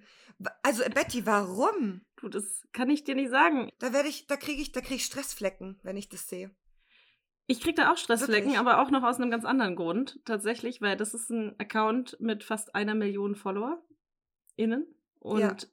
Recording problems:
none

